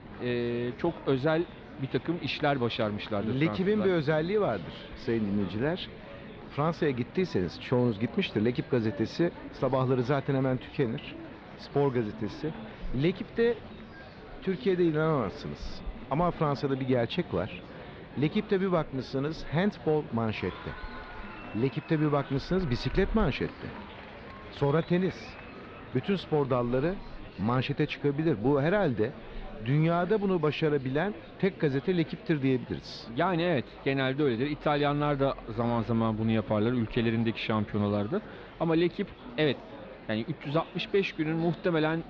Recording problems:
muffled; slightly; fading above 4 kHz
murmuring crowd; noticeable; throughout; 15 dB below the speech
animal sounds; faint; throughout; 20 dB below the speech

